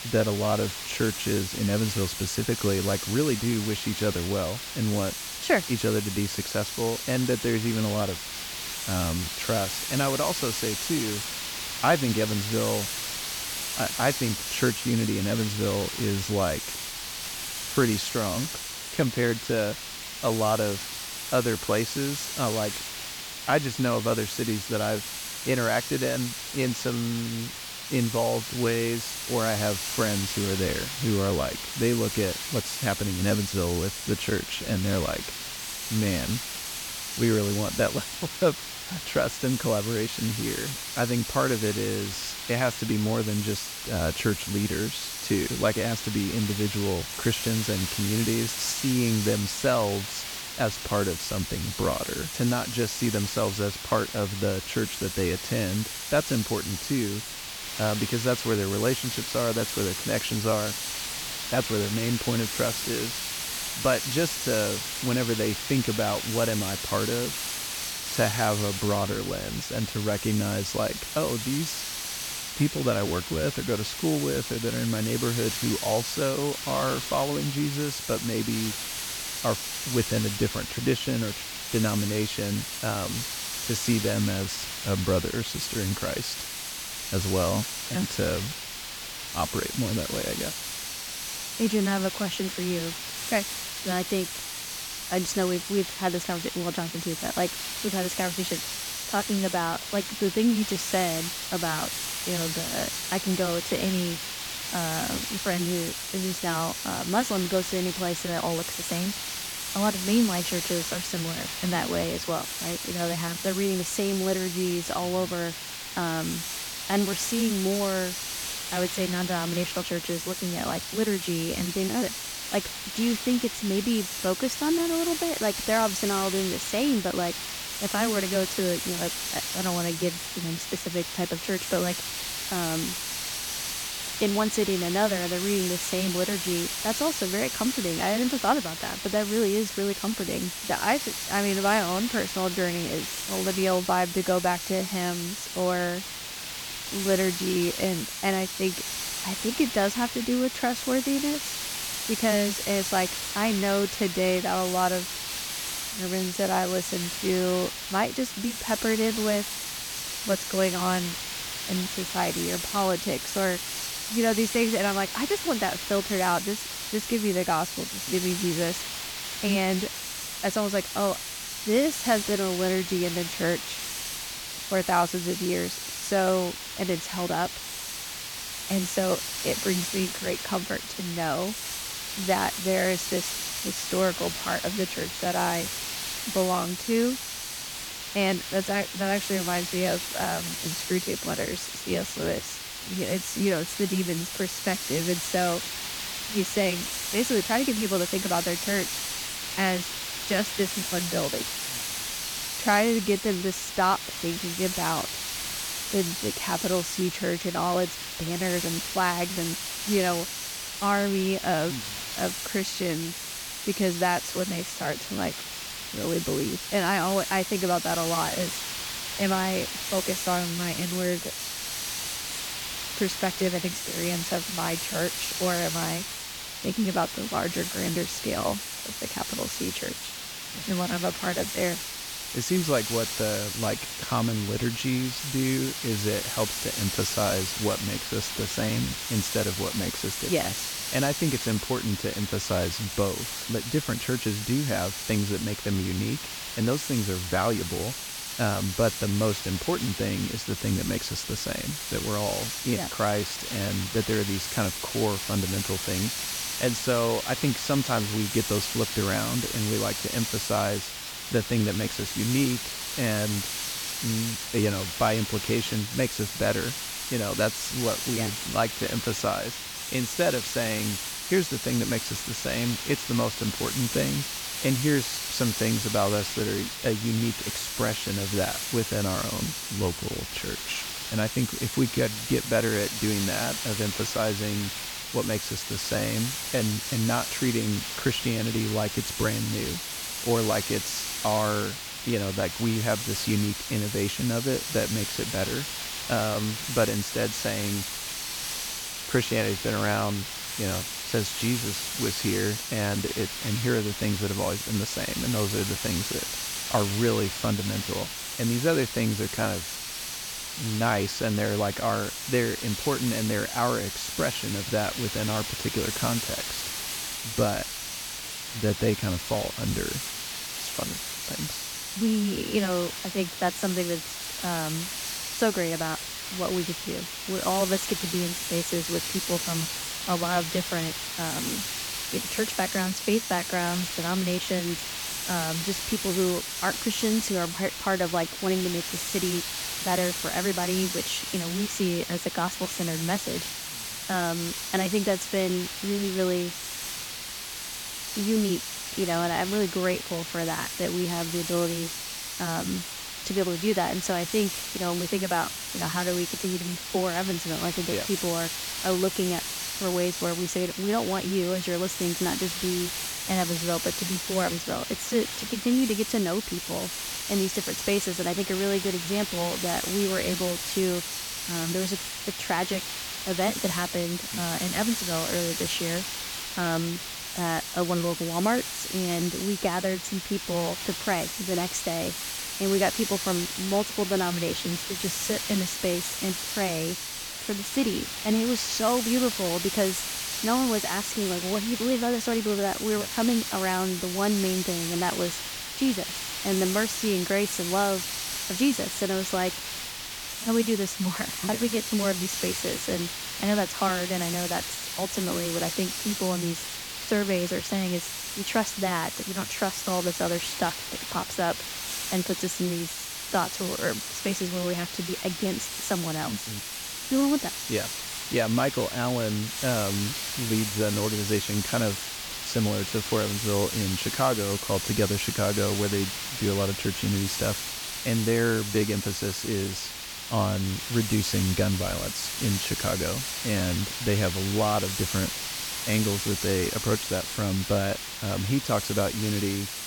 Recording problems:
hiss; loud; throughout; 3 dB below the speech

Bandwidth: 18 kHz